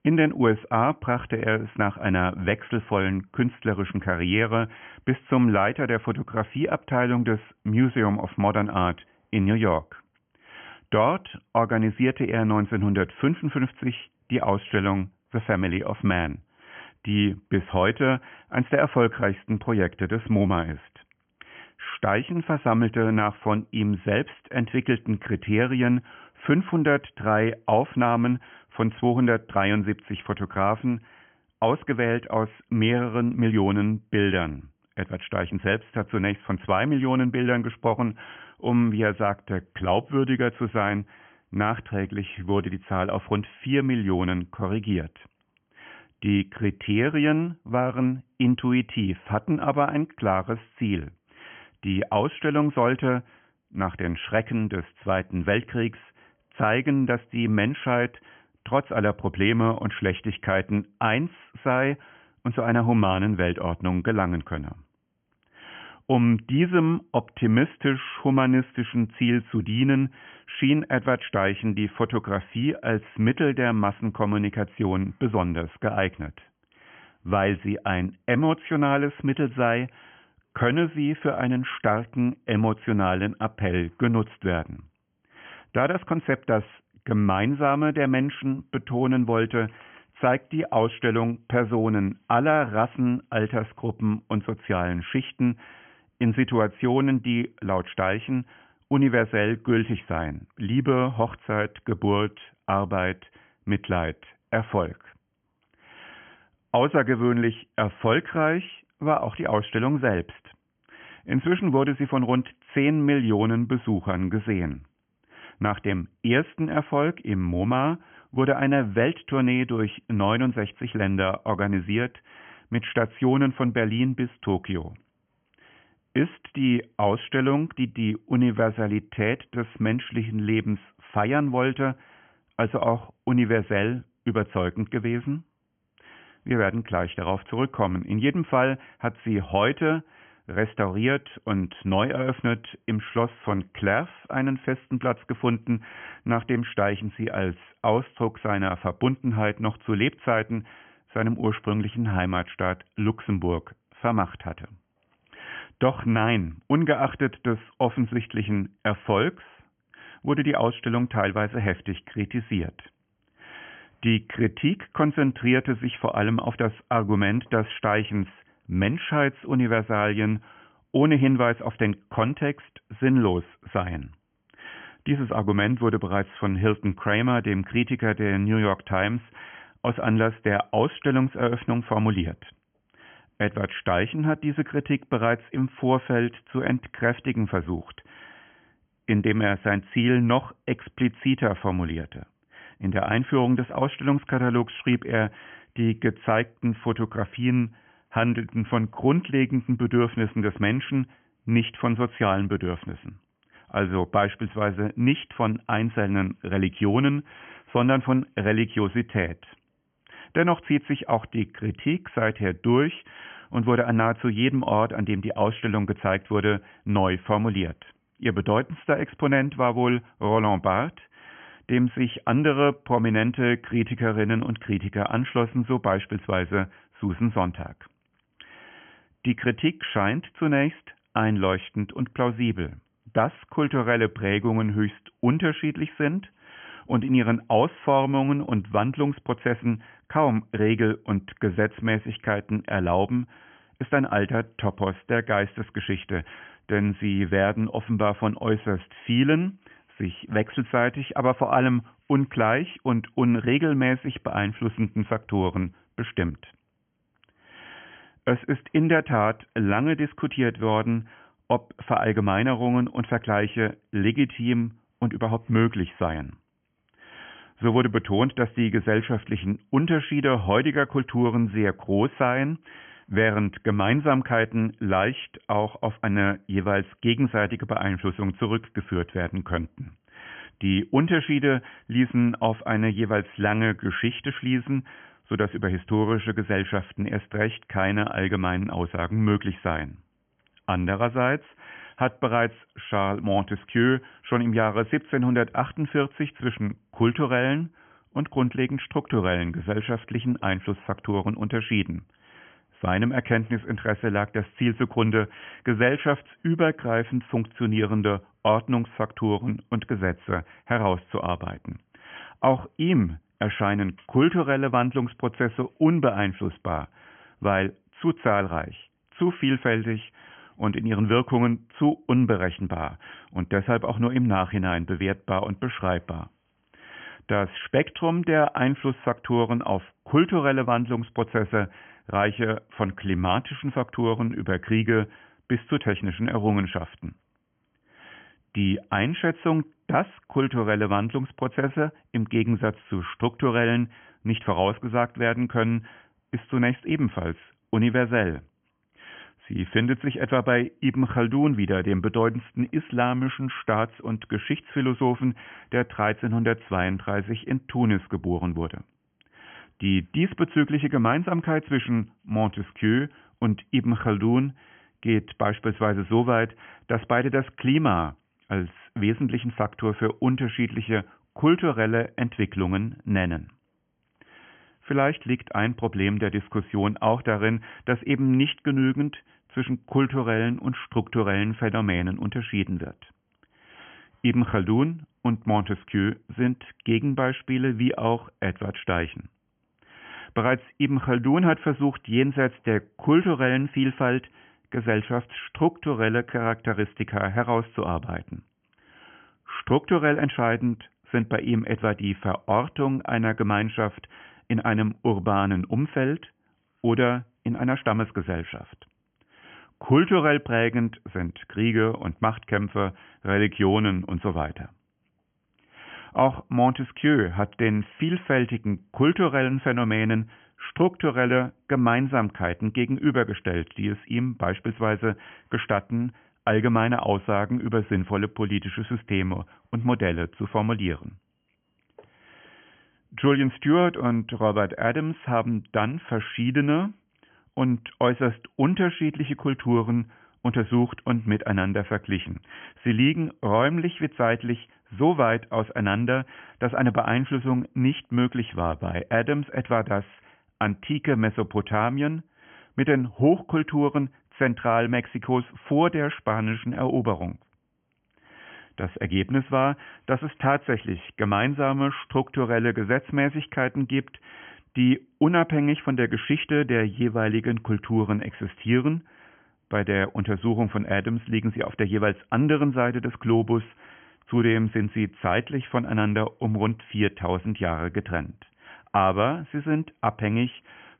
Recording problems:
high frequencies cut off; severe; nothing above 3.5 kHz

